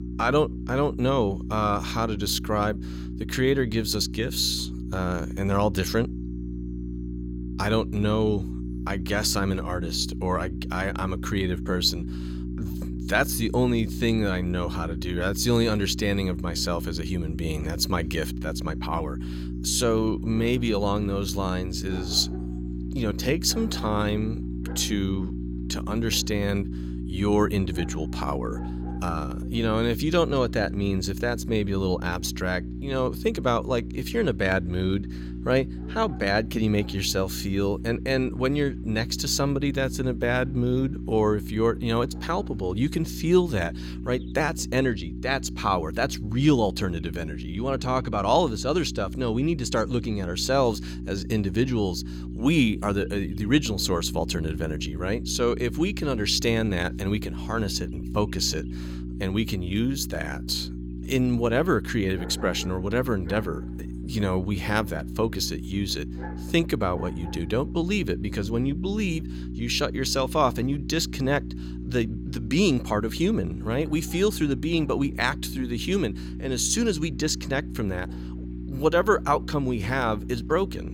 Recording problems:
electrical hum; noticeable; throughout; 60 Hz, 15 dB below the speech
animal sounds; faint; throughout; 25 dB below the speech

